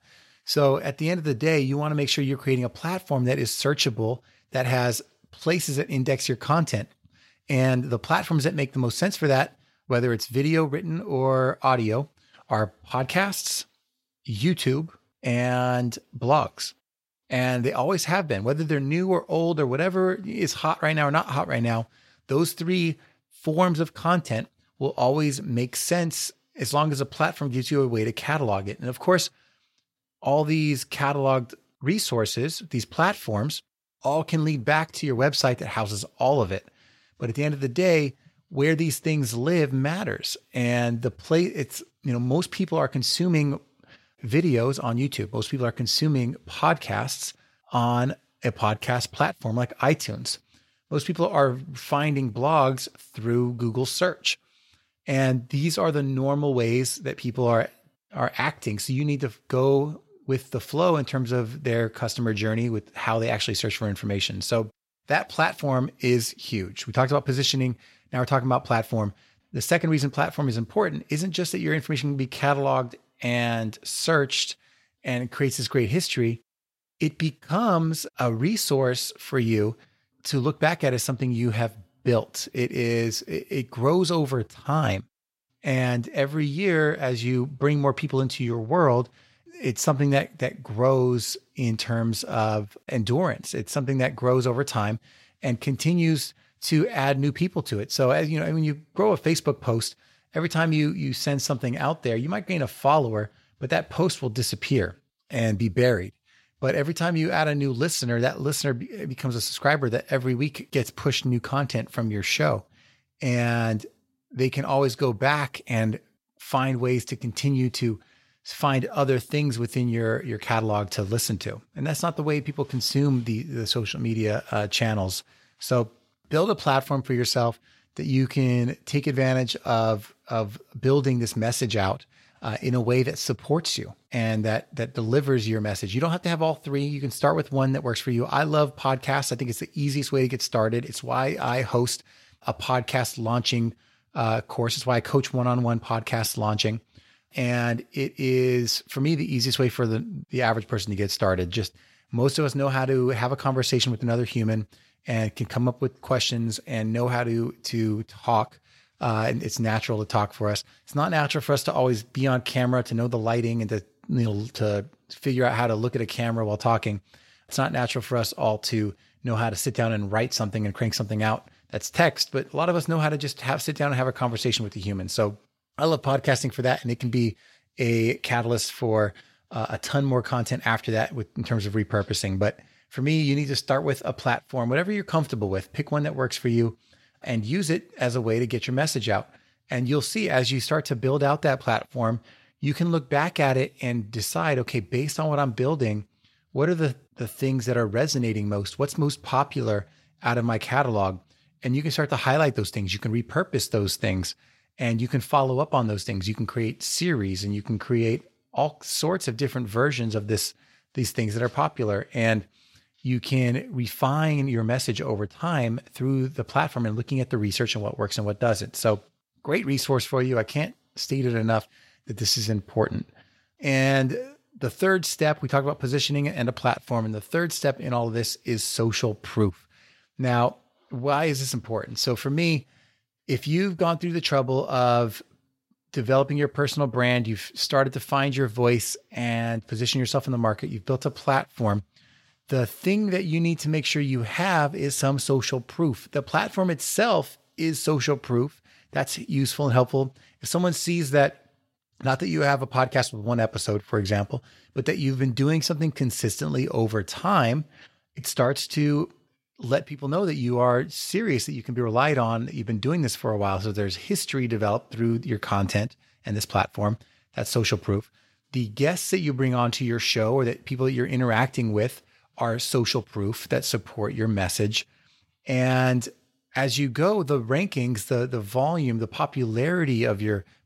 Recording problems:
none

